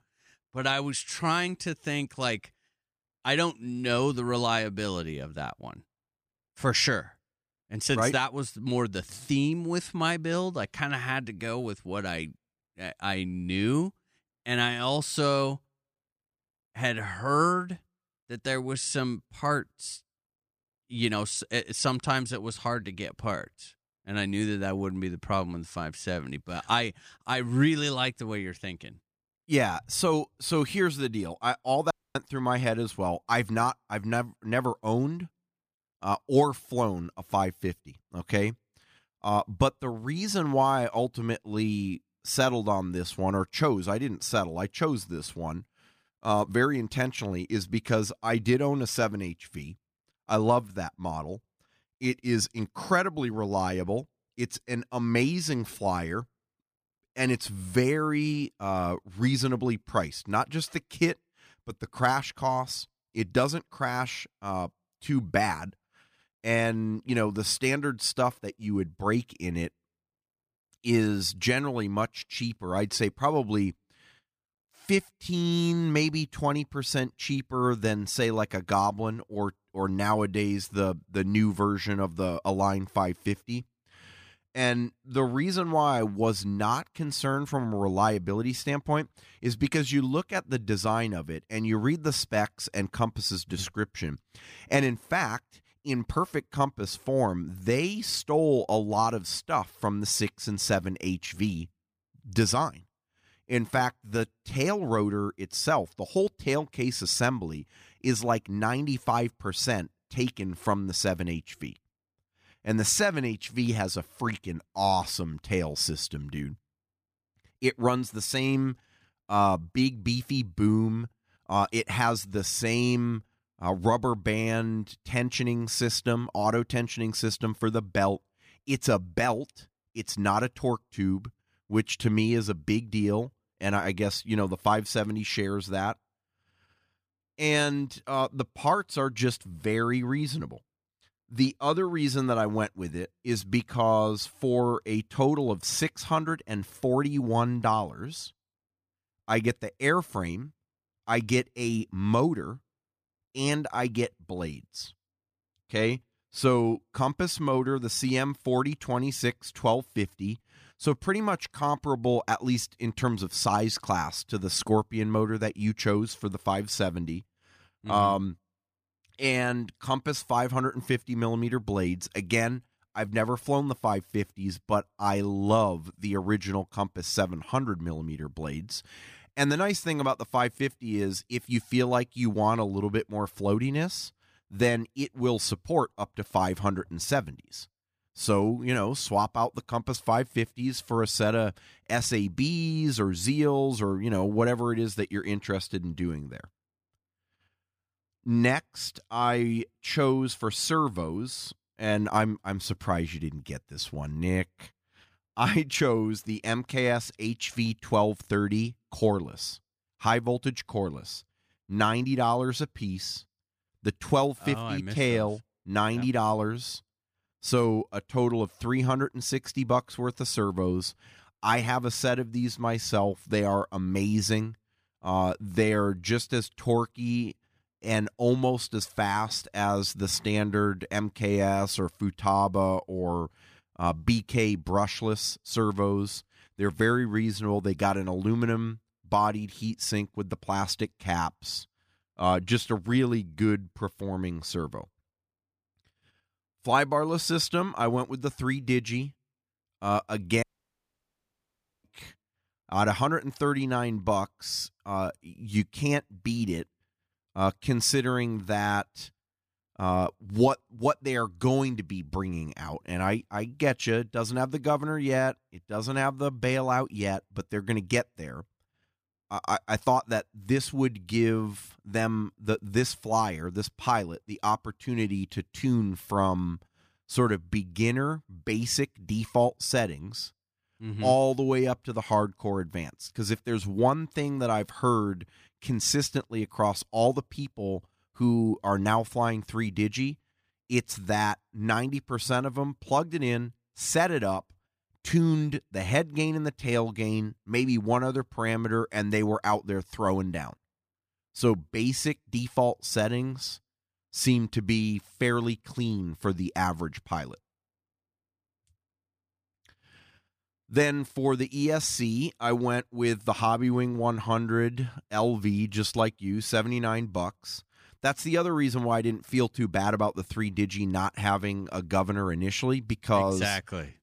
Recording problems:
audio cutting out; at 32 s and at 4:10 for 1.5 s

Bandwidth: 15 kHz